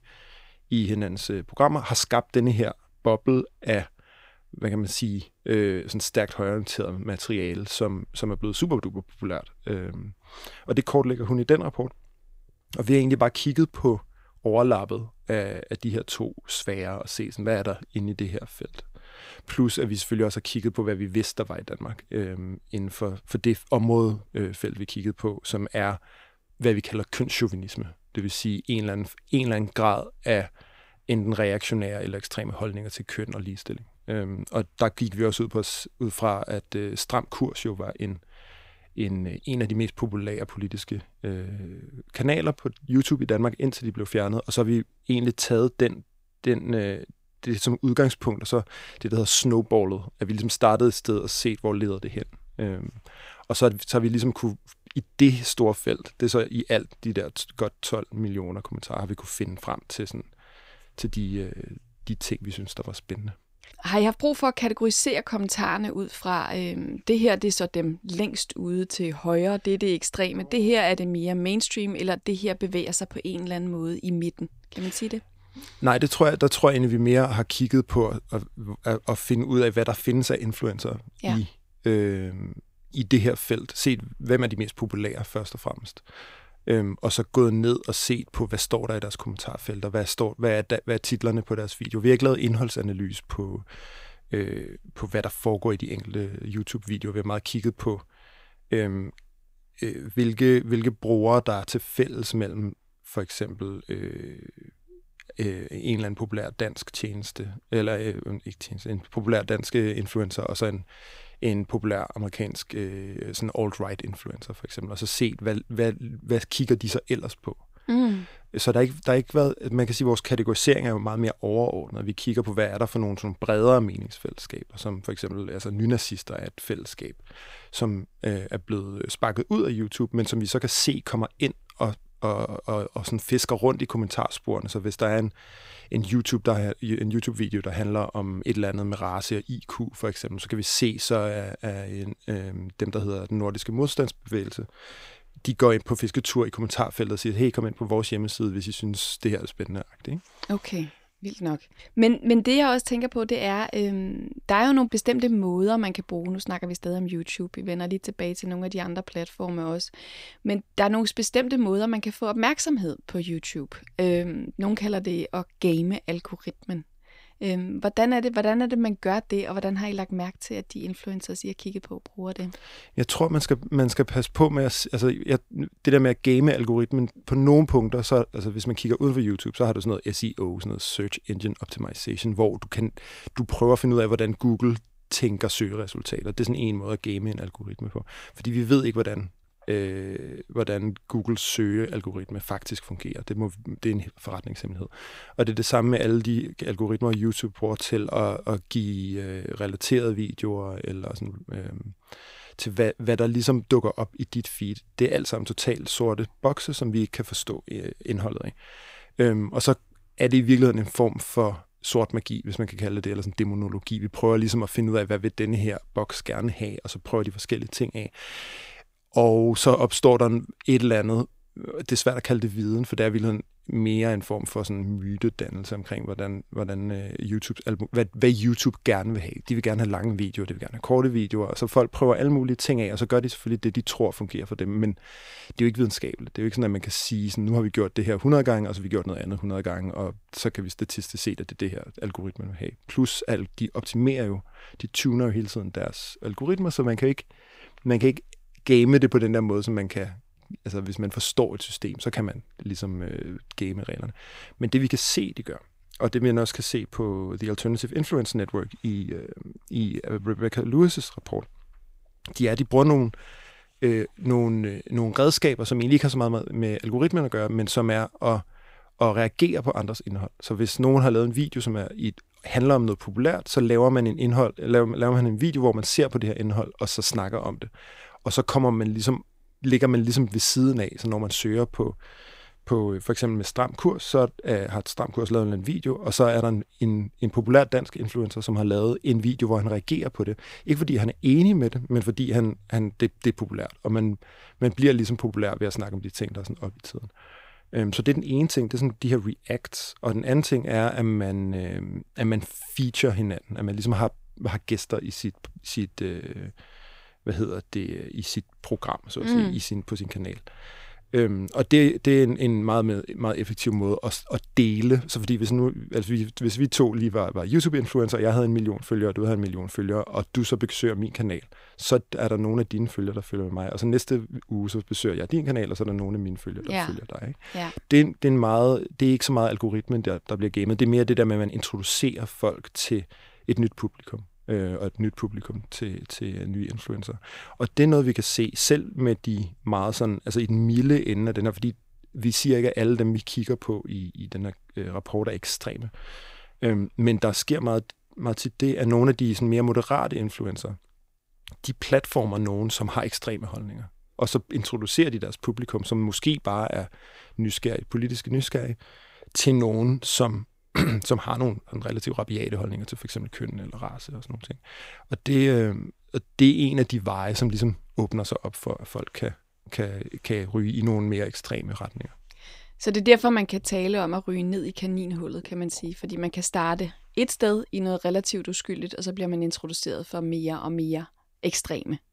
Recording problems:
none

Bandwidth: 15.5 kHz